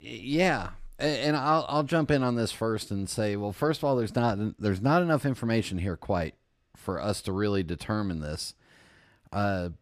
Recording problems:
none

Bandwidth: 15 kHz